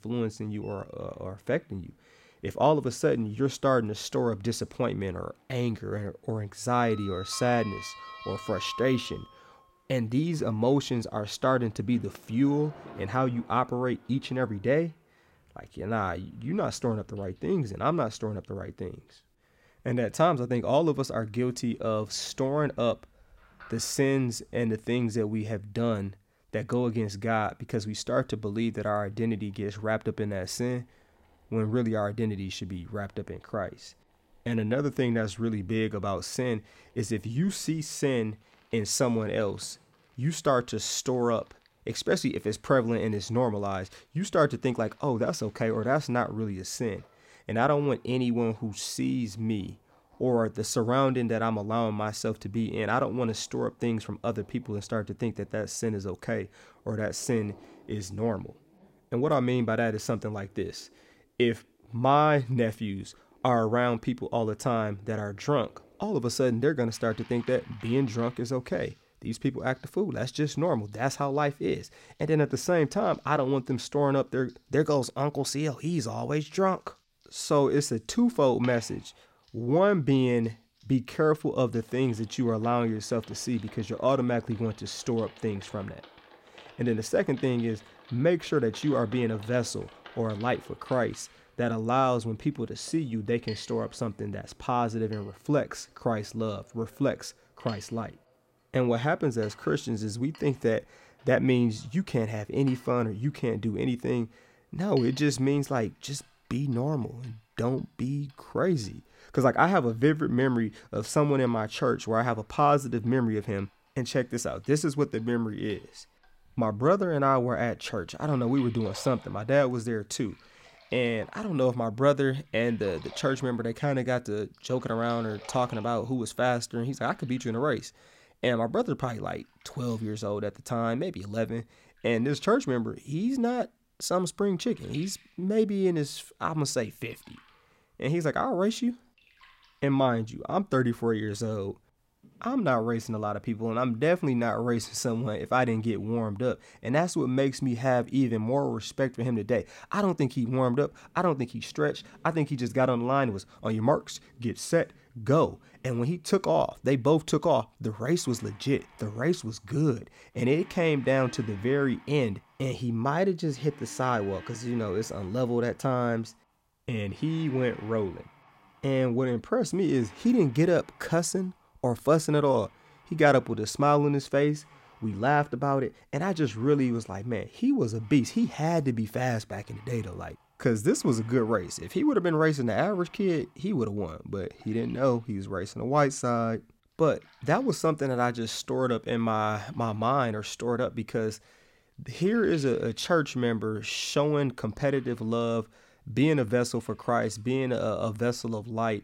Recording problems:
household noises; faint; throughout; 25 dB below the speech

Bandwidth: 16 kHz